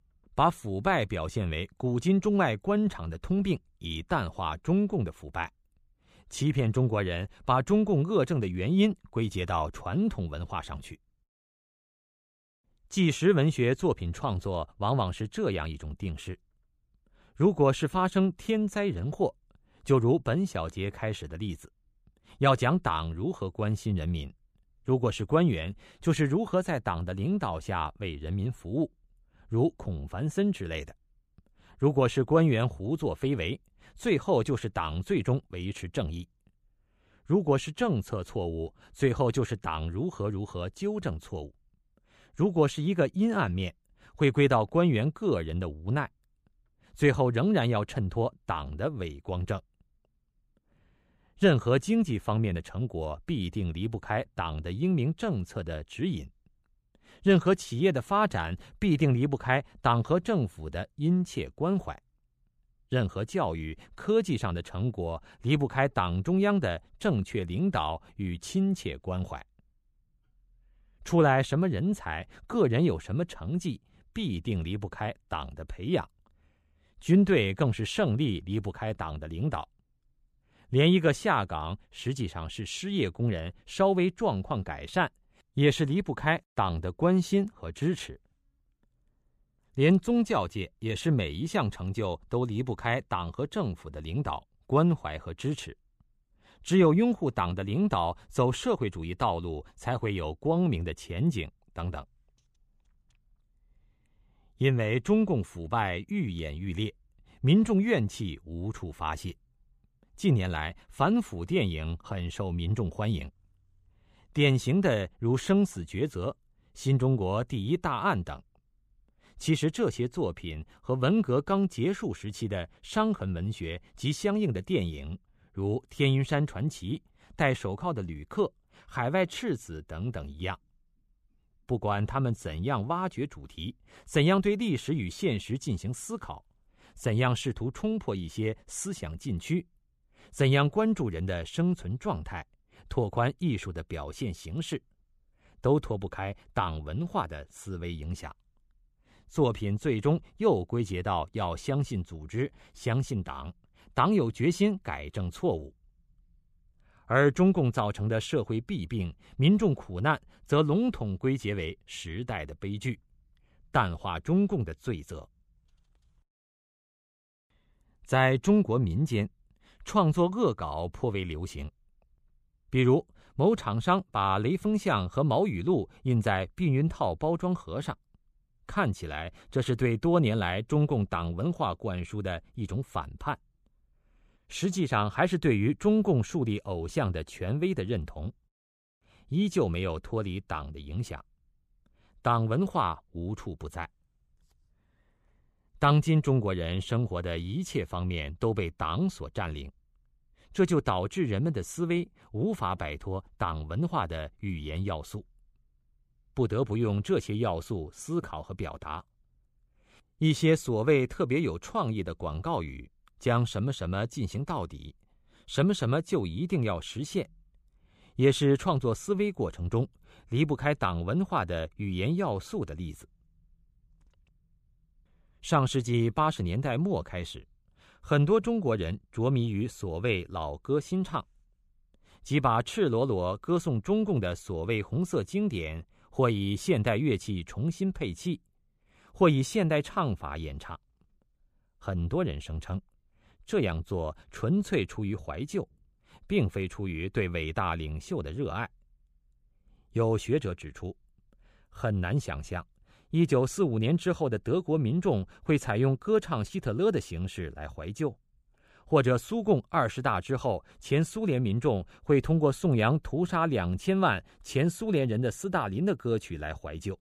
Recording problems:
none

